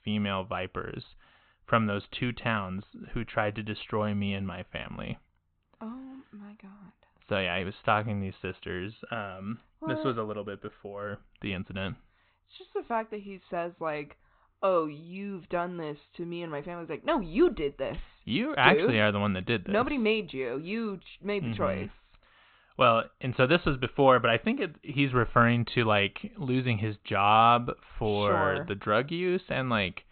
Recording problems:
high frequencies cut off; severe; nothing above 4 kHz

